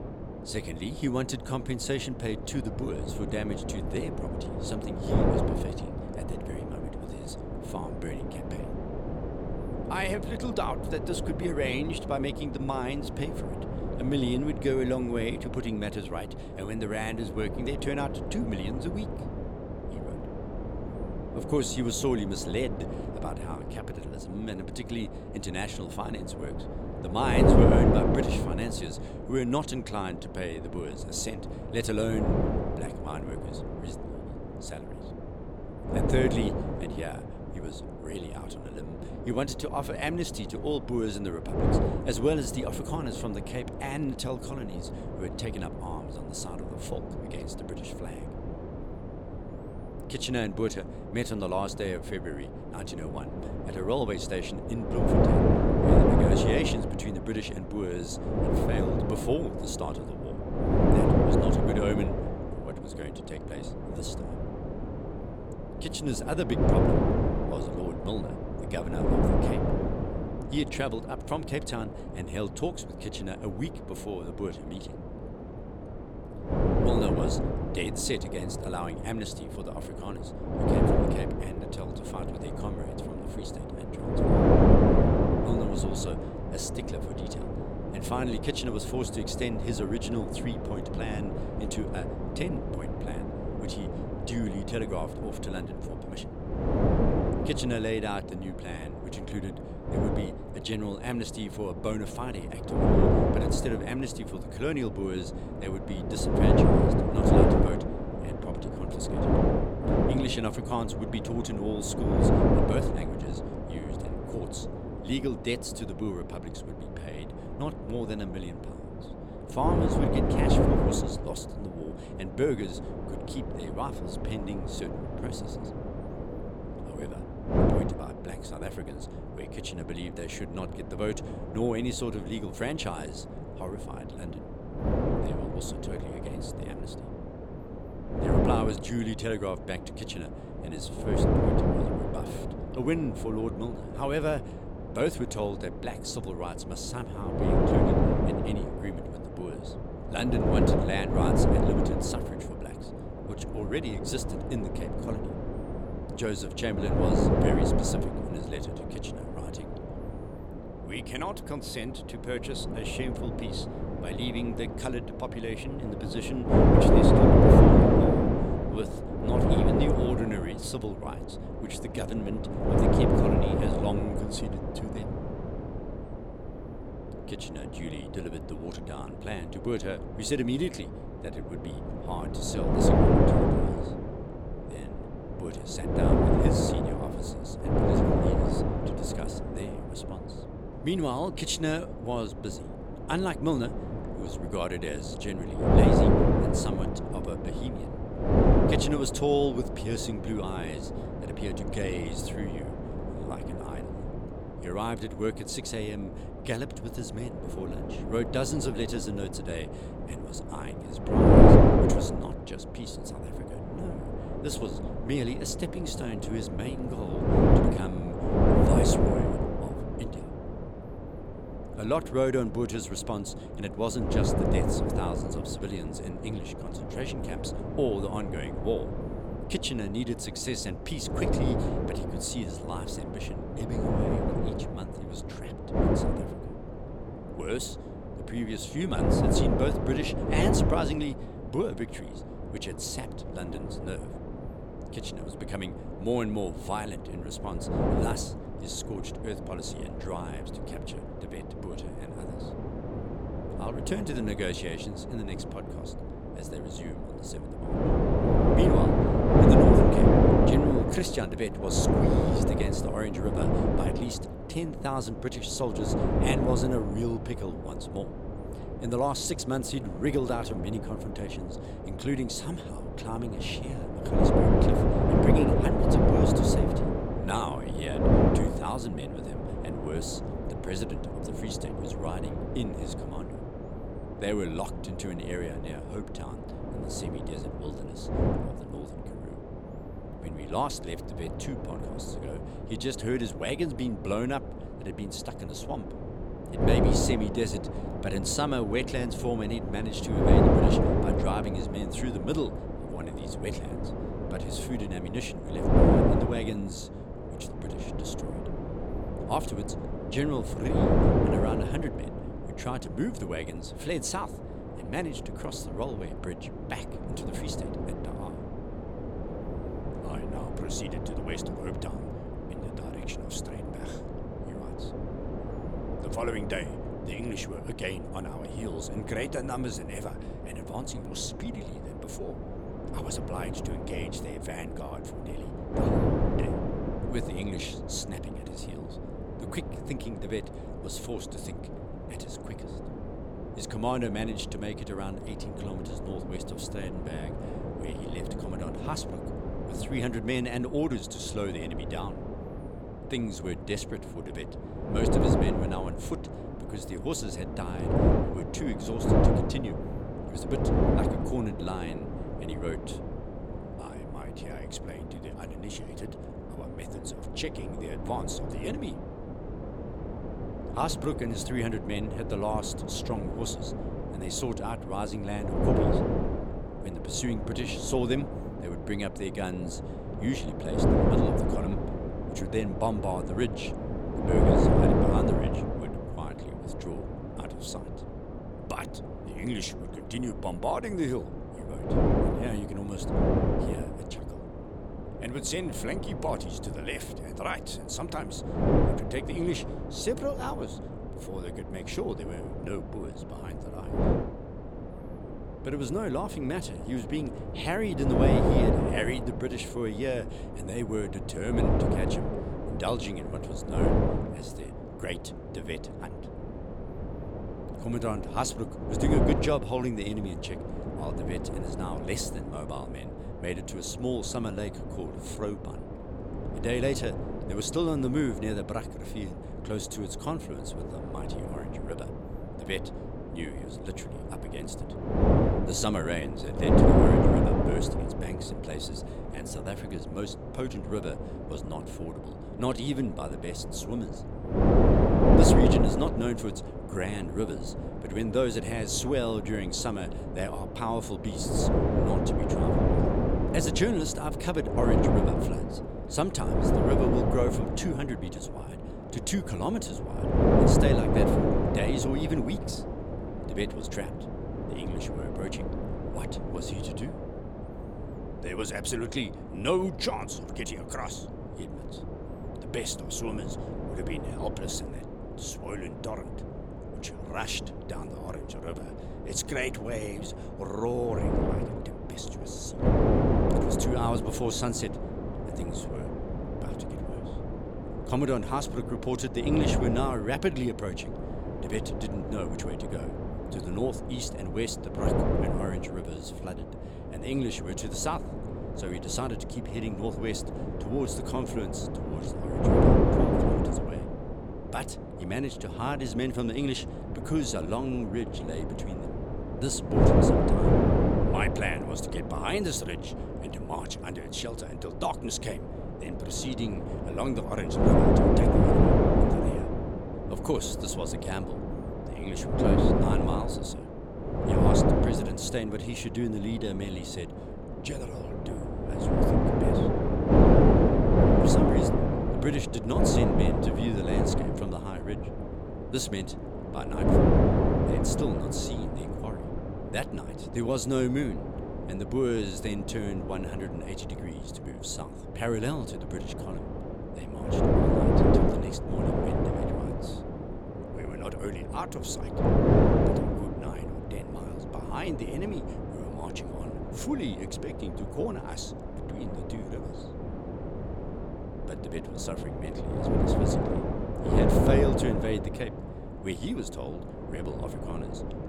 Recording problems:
wind noise on the microphone; heavy; 3 dB above the speech

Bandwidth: 17.5 kHz